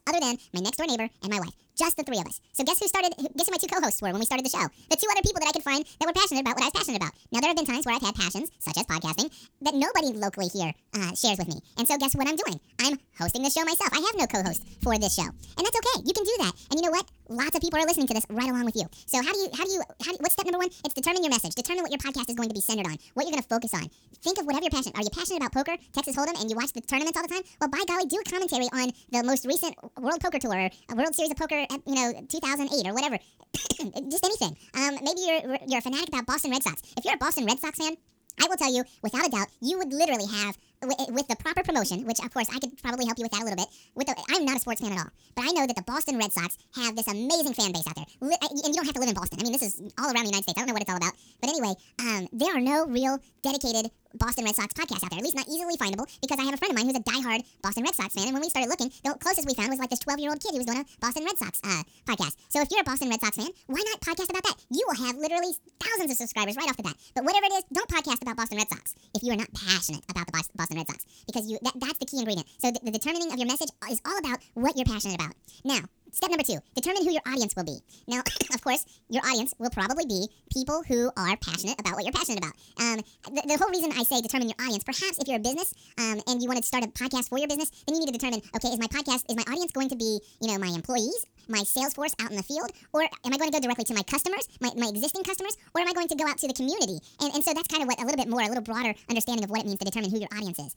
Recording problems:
wrong speed and pitch; too fast and too high; 1.7 times normal speed

